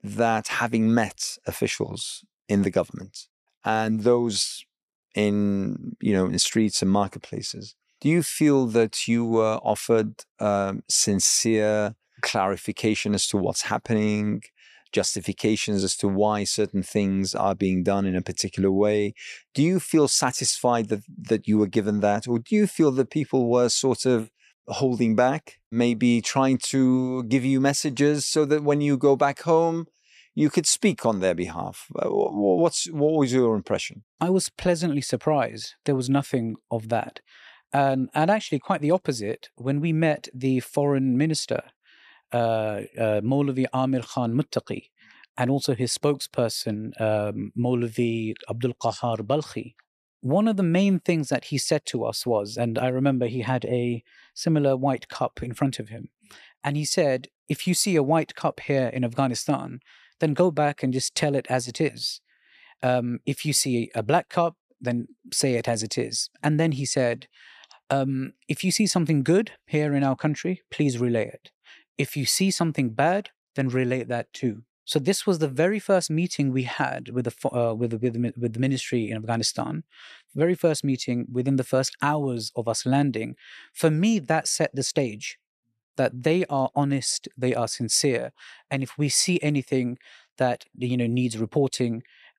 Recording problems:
none

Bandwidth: 14 kHz